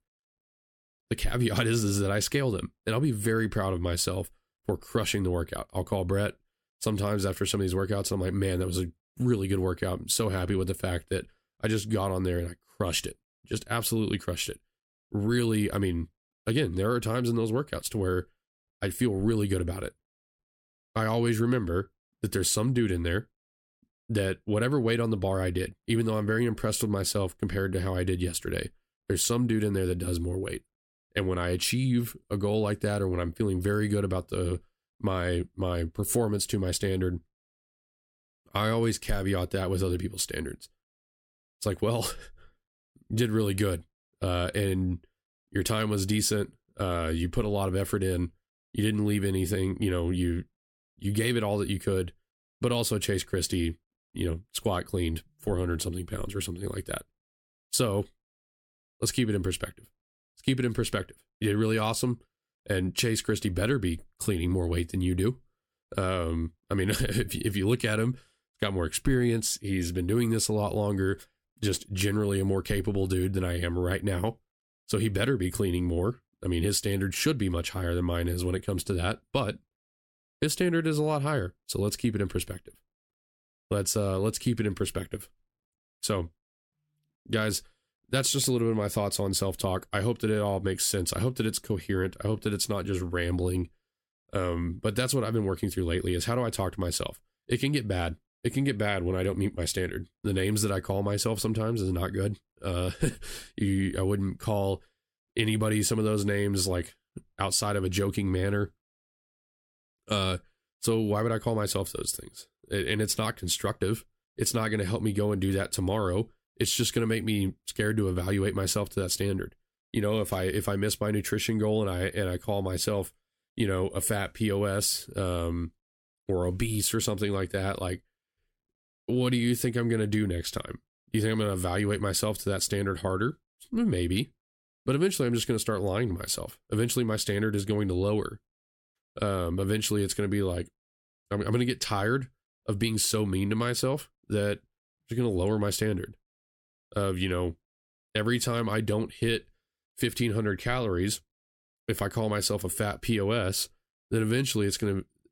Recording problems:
none

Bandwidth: 16.5 kHz